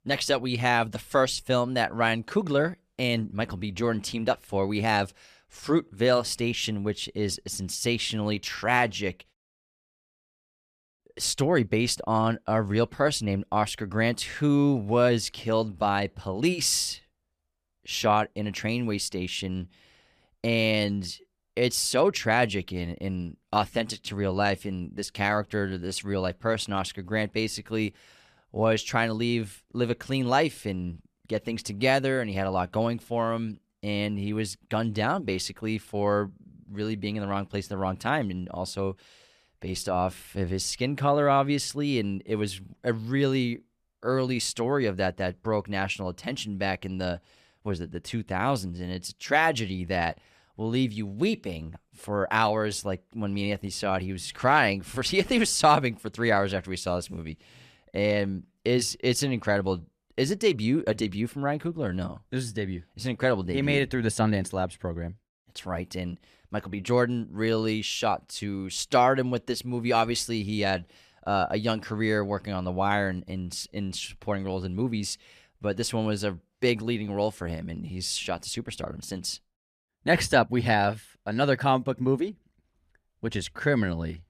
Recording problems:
none

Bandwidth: 14.5 kHz